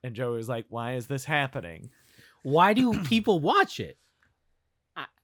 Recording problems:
none

